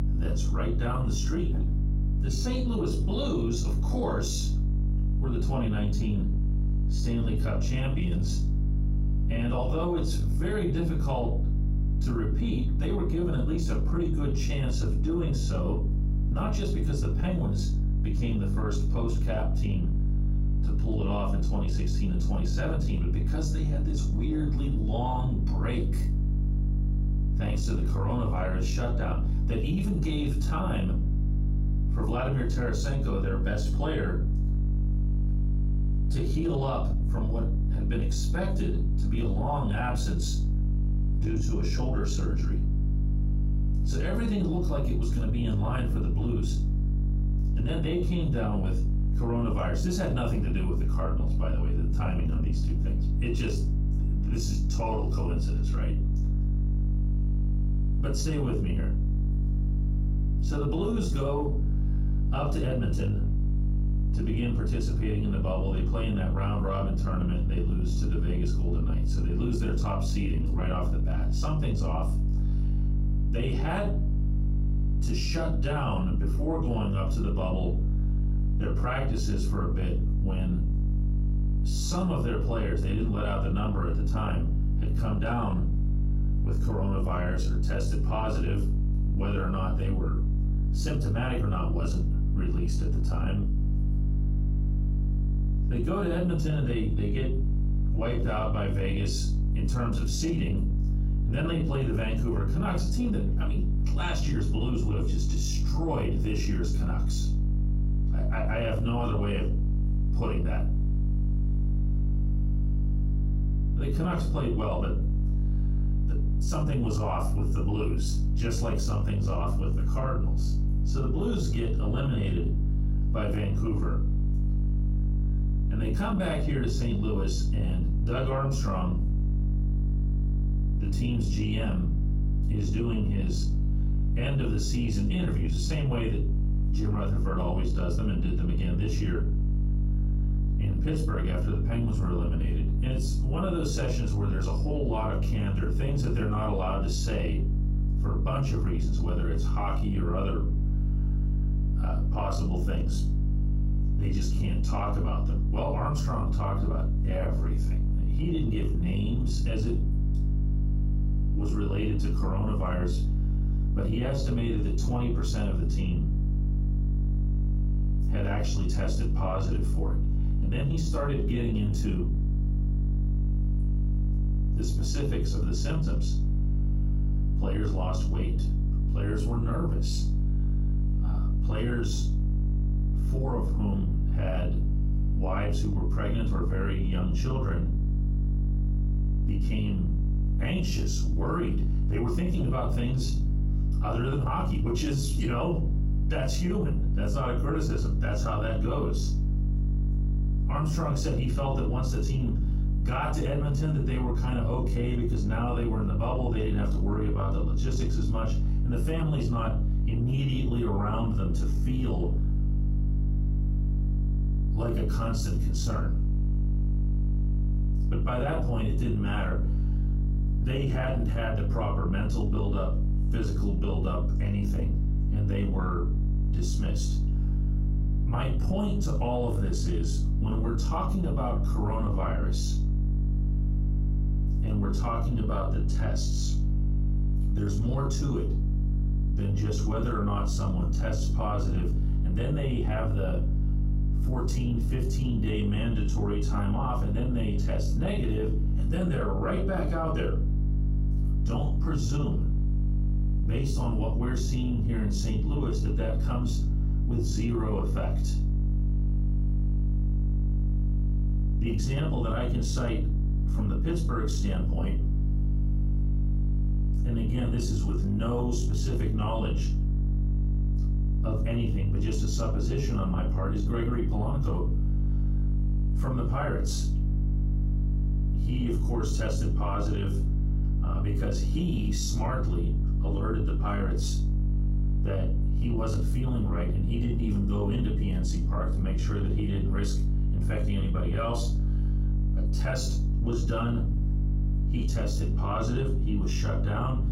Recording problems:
off-mic speech; far
room echo; slight; dies away in 0.3 s
squashed, flat; somewhat
electrical hum; loud; throughout; 50 Hz, 8 dB below the speech

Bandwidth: 16 kHz